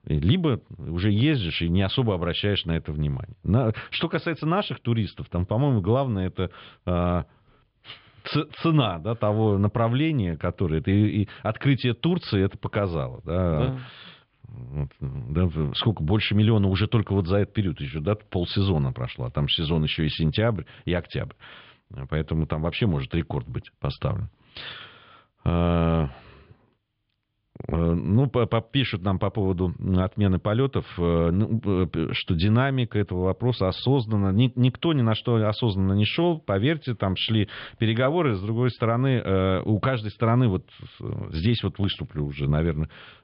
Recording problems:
high frequencies cut off; noticeable; nothing above 5.5 kHz
muffled; very slightly; fading above 4 kHz

